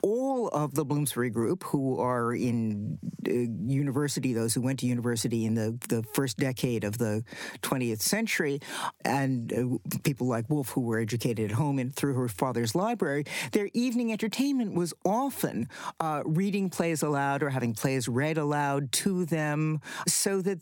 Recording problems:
squashed, flat; somewhat

